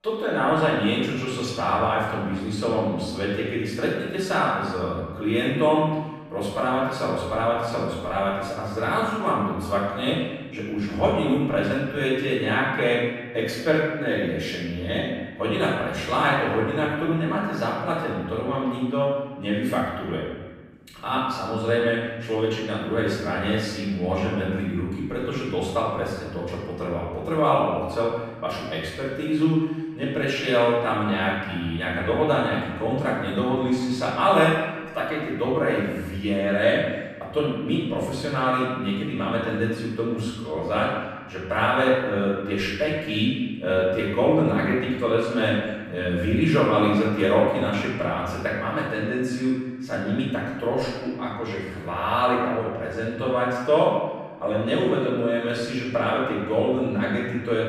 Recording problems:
off-mic speech; far
room echo; noticeable; dies away in 1.2 s

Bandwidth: 15 kHz